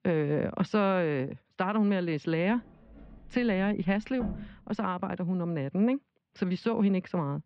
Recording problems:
muffled; very; fading above 3.5 kHz
door banging; noticeable; from 3 to 4.5 s; peak 8 dB below the speech

